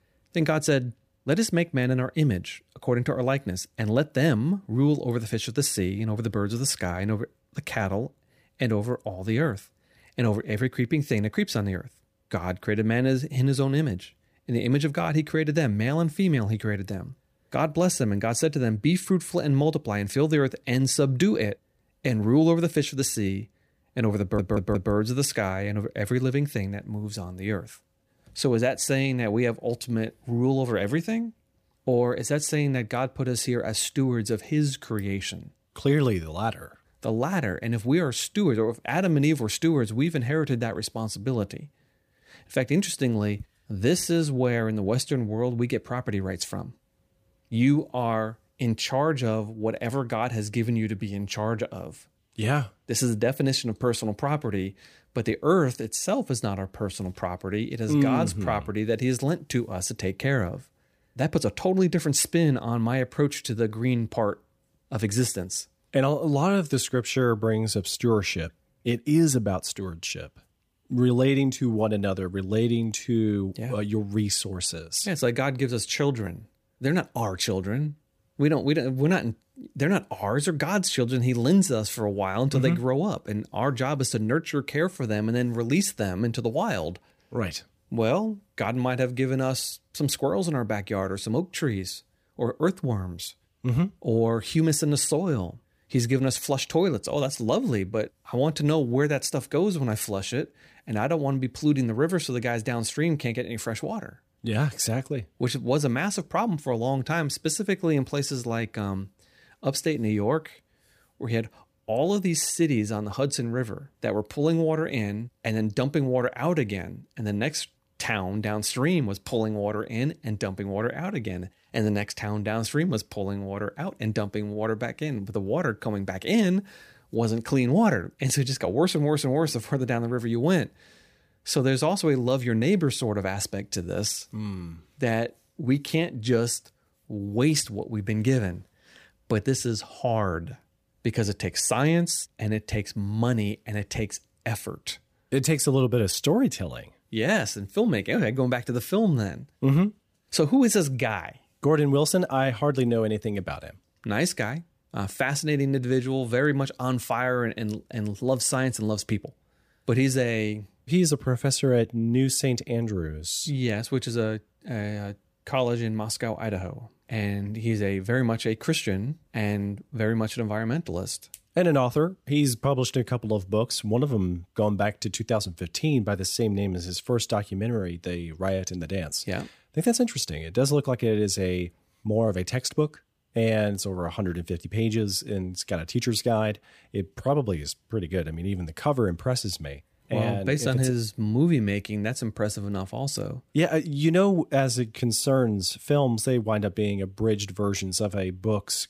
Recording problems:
audio stuttering; at 24 s

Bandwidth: 15 kHz